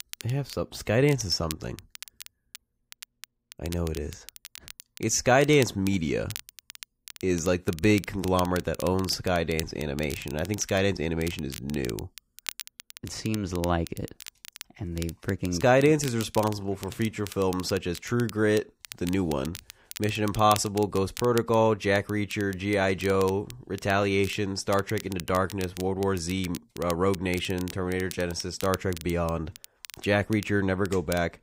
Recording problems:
crackle, like an old record; noticeable; 15 dB below the speech

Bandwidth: 15.5 kHz